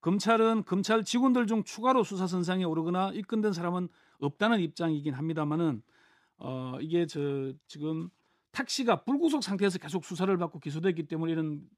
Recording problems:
none

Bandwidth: 14.5 kHz